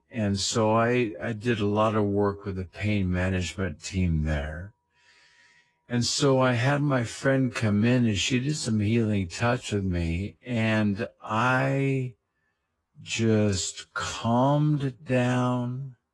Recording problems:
wrong speed, natural pitch; too slow; 0.6 times normal speed
garbled, watery; slightly

